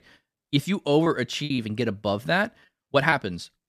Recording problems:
choppy; very; from 1.5 to 3 s; 8% of the speech affected

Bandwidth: 14.5 kHz